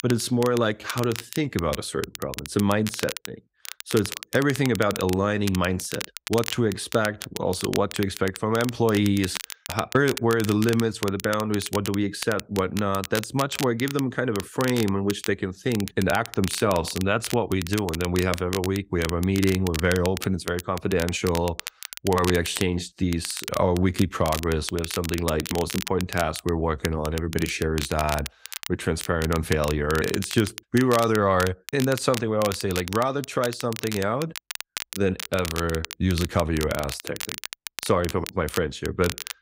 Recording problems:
crackle, like an old record; loud; 10 dB below the speech

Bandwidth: 15.5 kHz